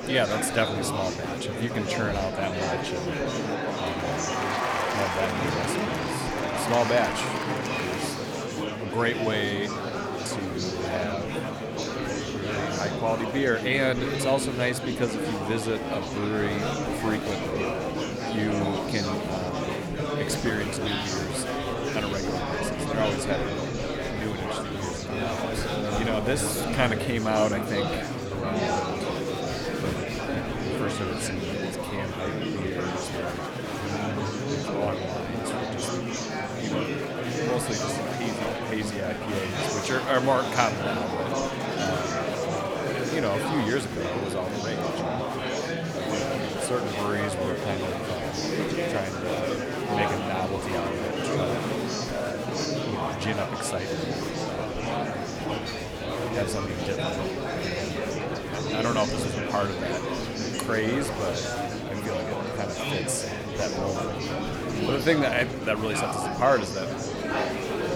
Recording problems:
murmuring crowd; very loud; throughout; 1 dB above the speech

